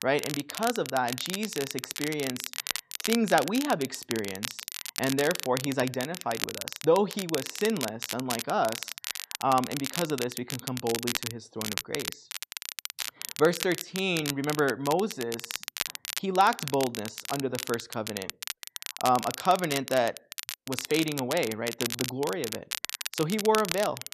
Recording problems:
crackle, like an old record; loud; 6 dB below the speech

